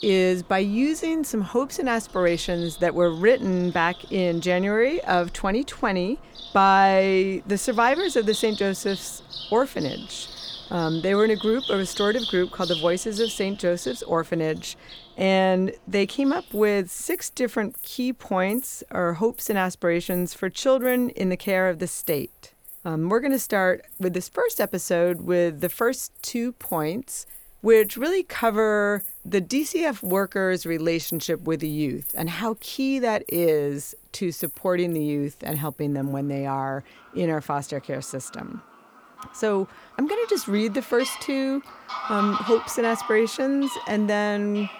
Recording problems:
animal sounds; noticeable; throughout; 10 dB below the speech

